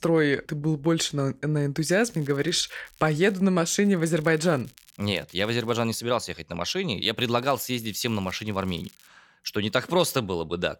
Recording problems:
crackling; faint; from 2 to 3.5 s, from 4 to 6 s and from 7.5 to 9 s; 25 dB below the speech

